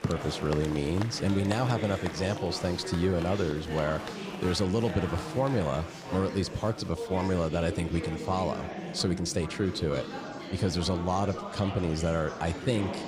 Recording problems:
murmuring crowd; loud; throughout; 8 dB below the speech

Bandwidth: 15.5 kHz